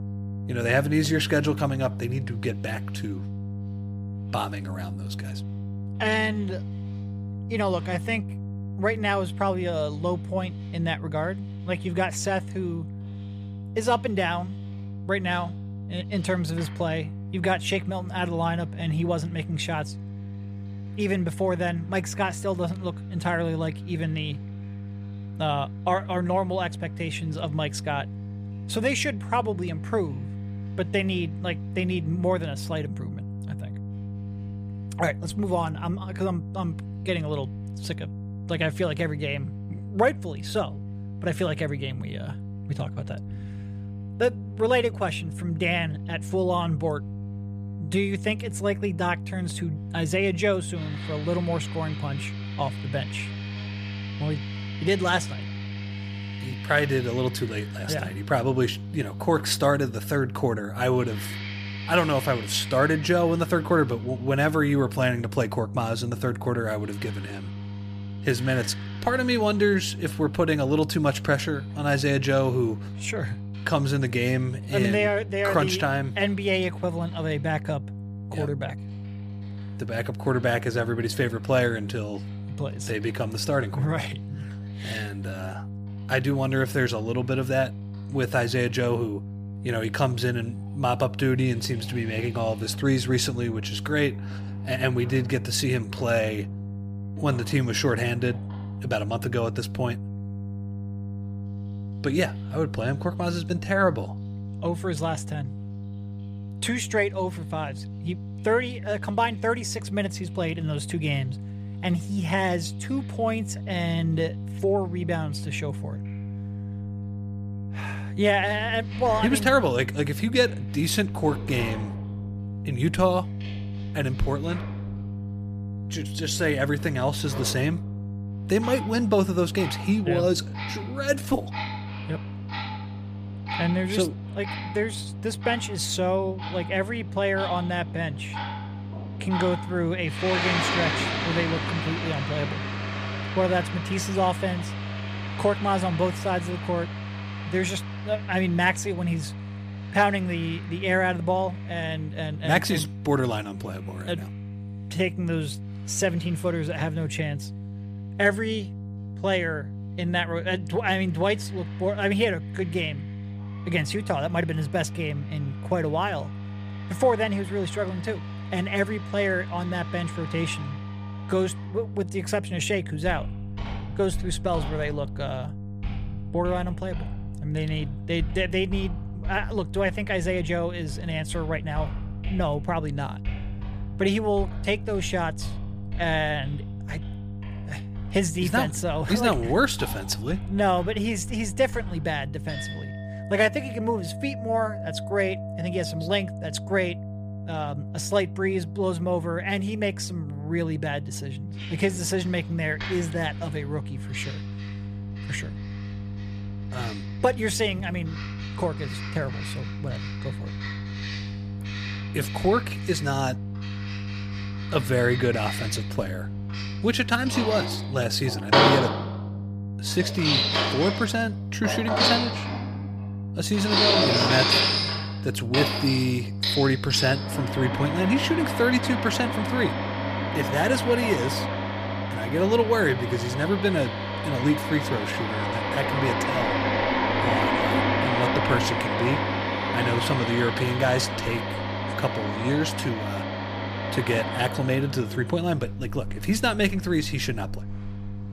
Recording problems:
household noises; loud; throughout; 4 dB below the speech
electrical hum; noticeable; throughout; 50 Hz, 20 dB below the speech

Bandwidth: 15 kHz